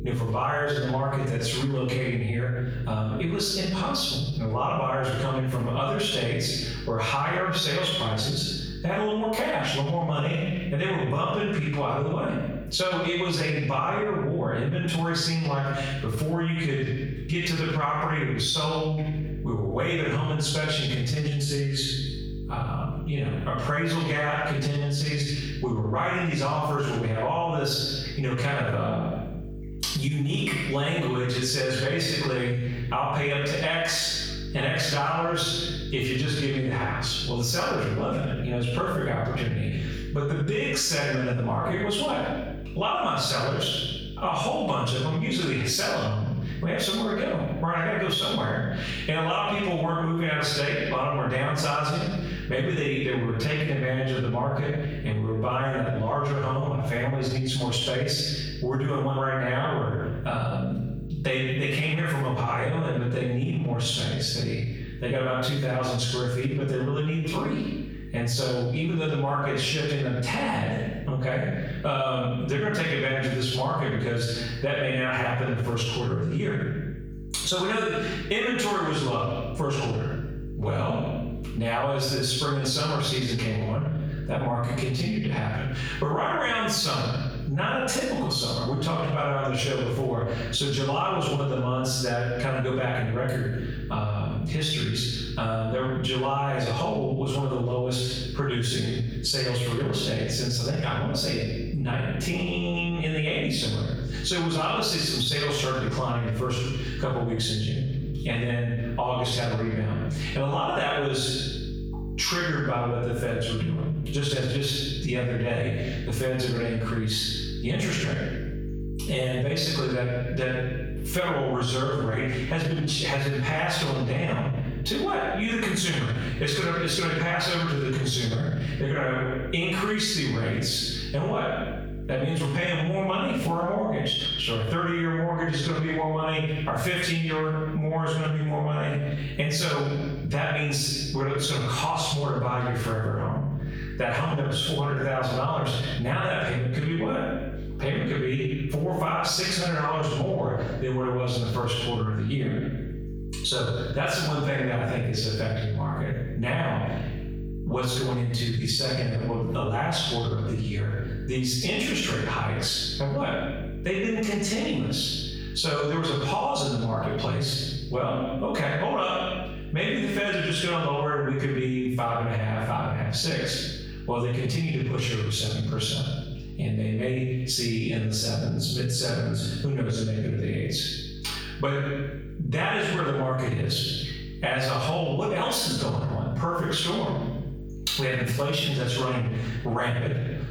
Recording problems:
off-mic speech; far
room echo; noticeable; dies away in 0.7 s
squashed, flat; somewhat
electrical hum; faint; throughout; 50 Hz, 25 dB below the speech

